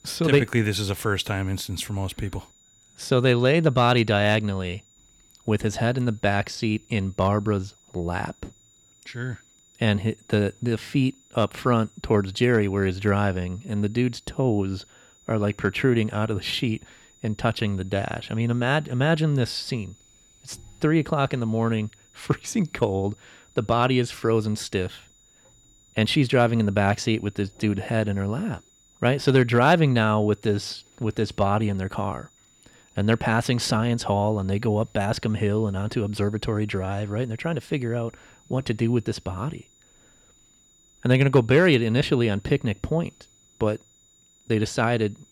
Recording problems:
high-pitched whine; faint; throughout; 7 kHz, 30 dB below the speech

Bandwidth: 18.5 kHz